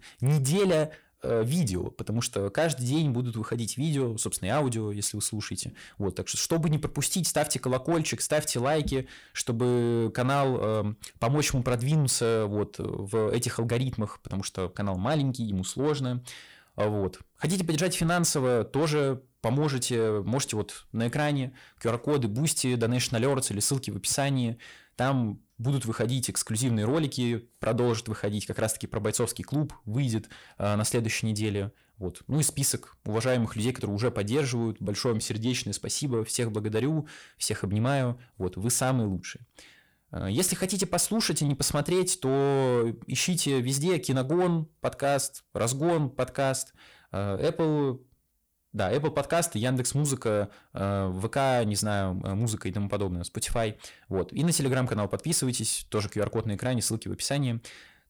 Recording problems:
distortion; slight; 10 dB below the speech

